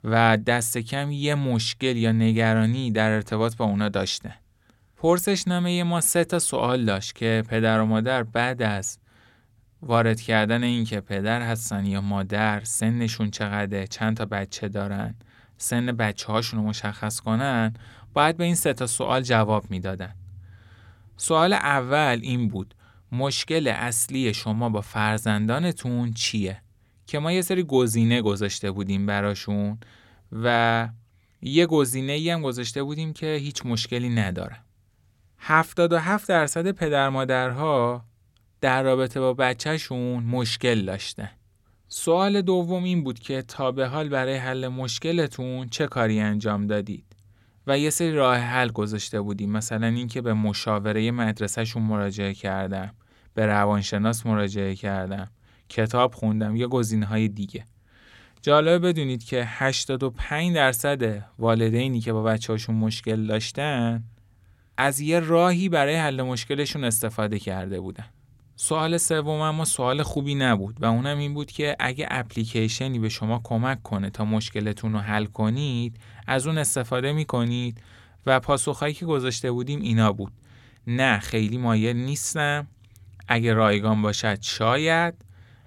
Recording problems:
none

